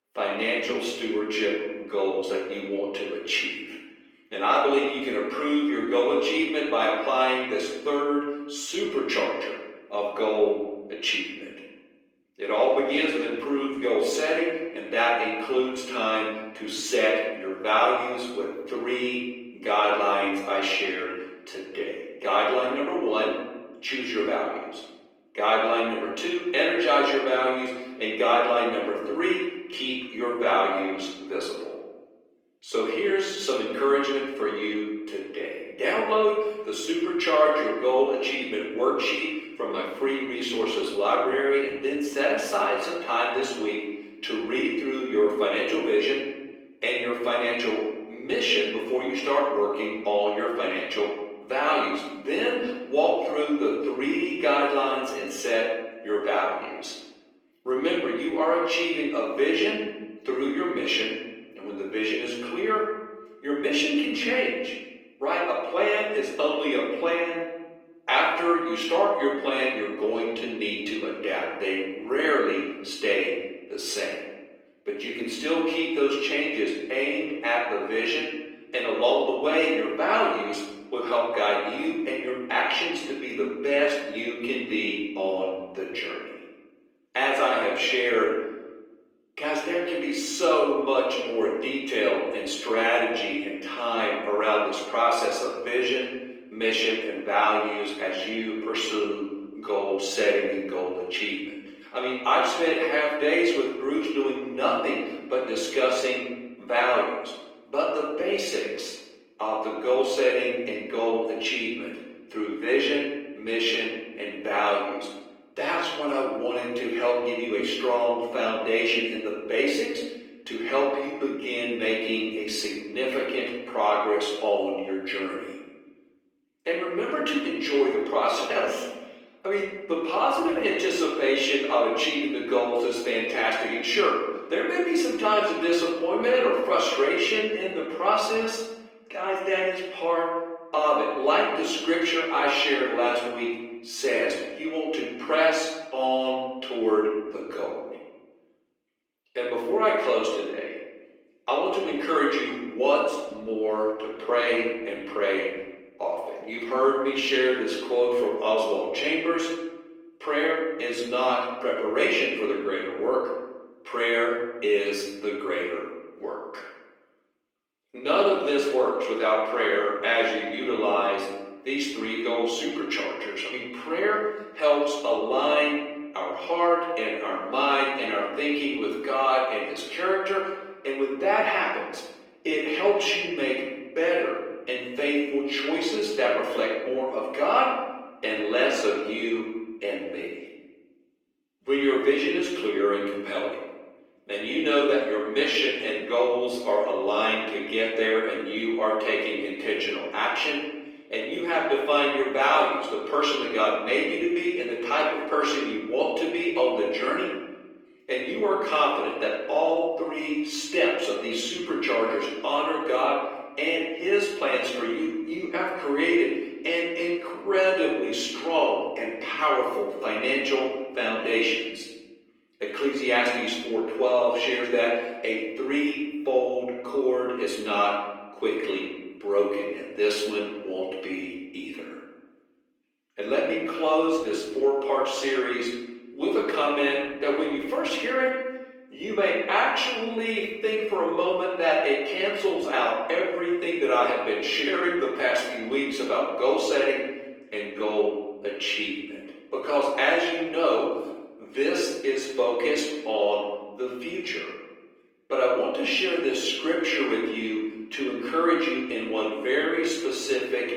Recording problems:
off-mic speech; far
room echo; noticeable; dies away in 1 s
thin; somewhat; fading below 350 Hz
garbled, watery; slightly; nothing above 17.5 kHz

